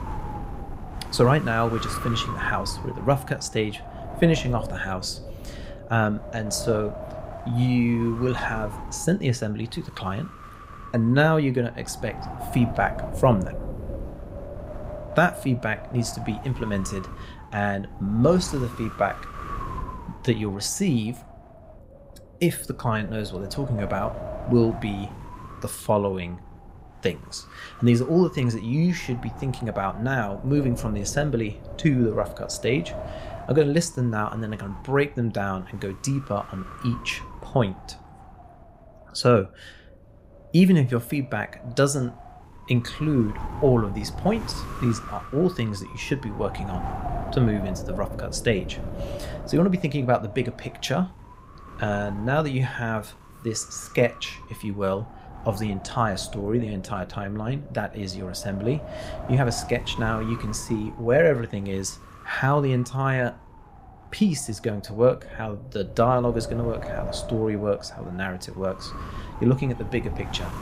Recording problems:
wind noise on the microphone; occasional gusts; 10 dB below the speech

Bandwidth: 15.5 kHz